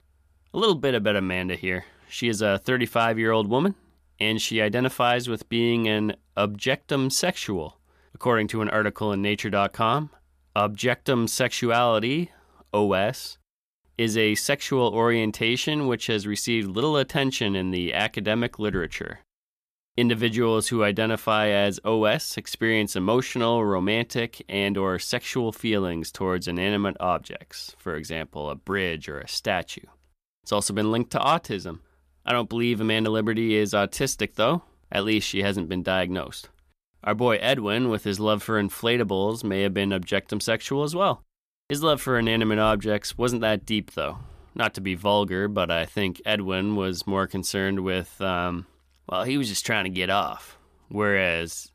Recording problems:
none

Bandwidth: 14.5 kHz